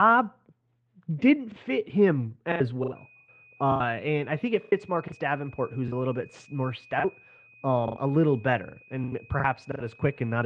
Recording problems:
muffled; very; fading above 3 kHz
garbled, watery; slightly
high-pitched whine; faint; from 3 s on; 2.5 kHz, 25 dB below the speech
choppy; very; 10% of the speech affected
abrupt cut into speech; at the start and the end

